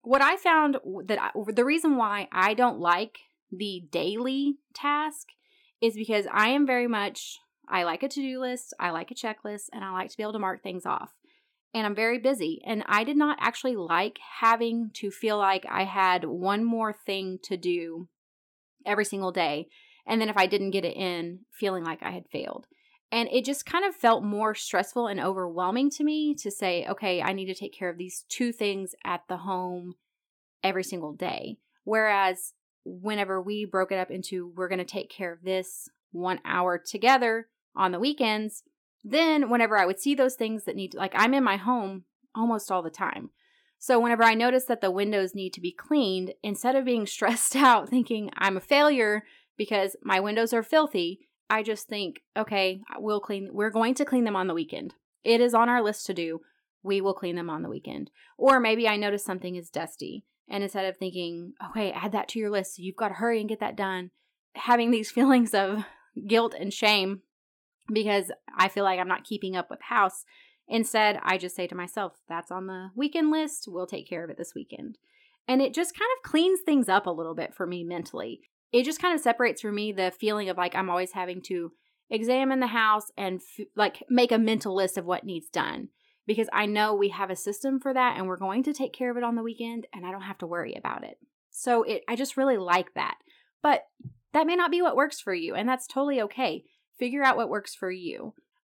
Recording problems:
none

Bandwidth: 17.5 kHz